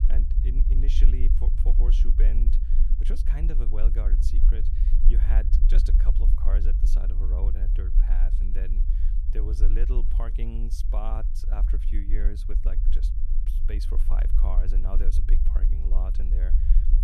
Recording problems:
low rumble; loud; throughout; 5 dB below the speech

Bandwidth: 14 kHz